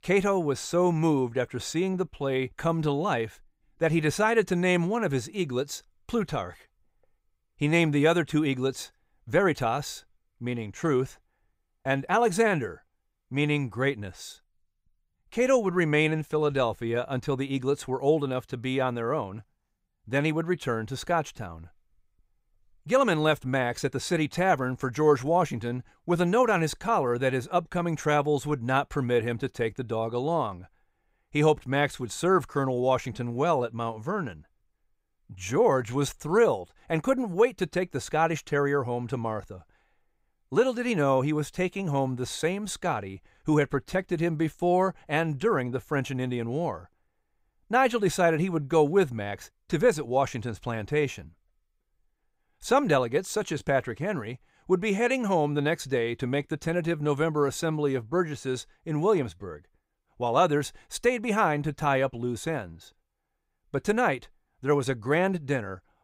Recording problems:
none

